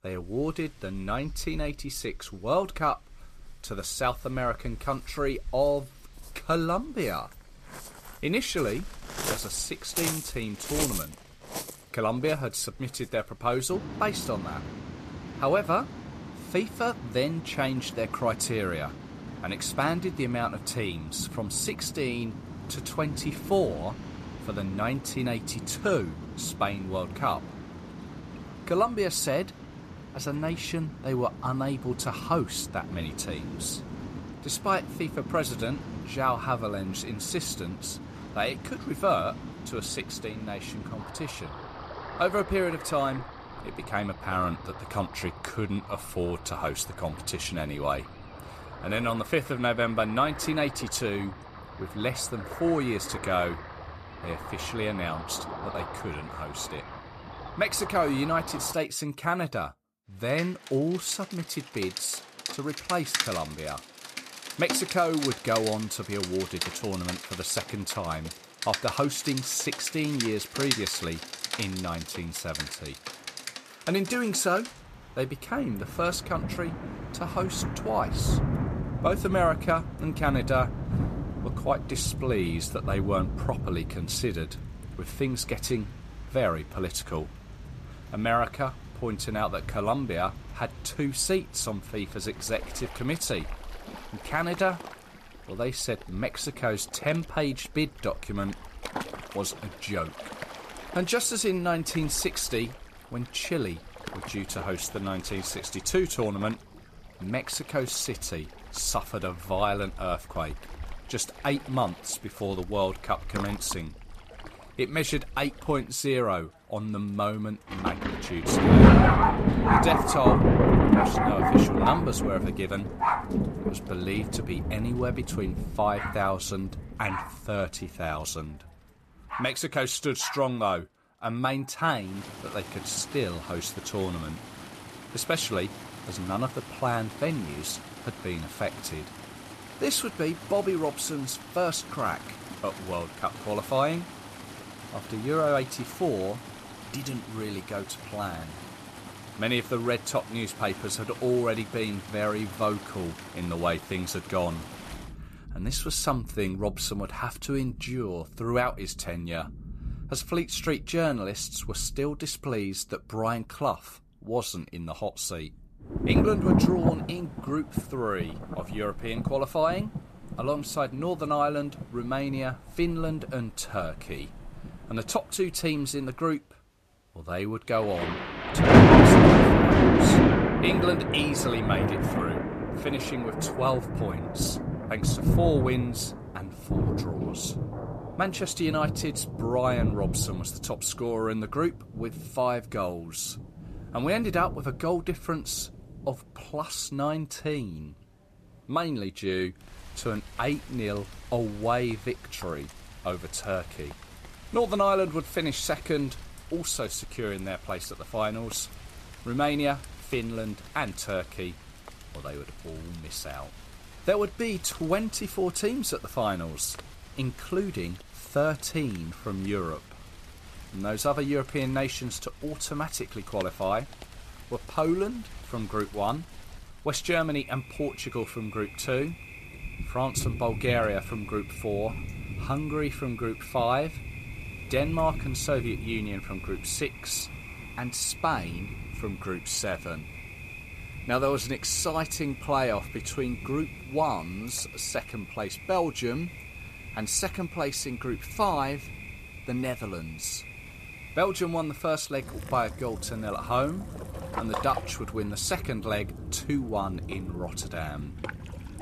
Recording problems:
rain or running water; very loud; throughout; as loud as the speech

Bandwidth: 14.5 kHz